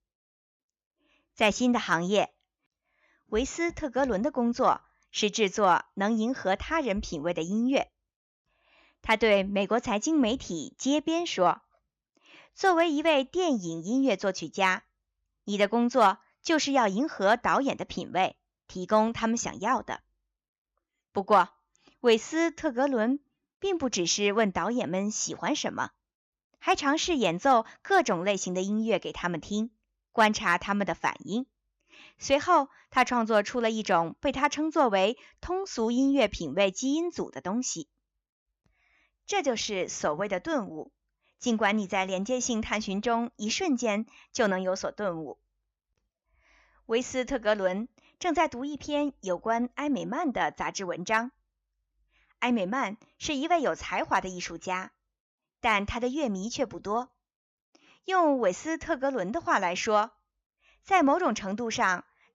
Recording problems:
none

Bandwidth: 15 kHz